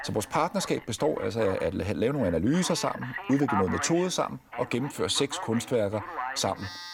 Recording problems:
alarms or sirens; loud; throughout; 10 dB below the speech

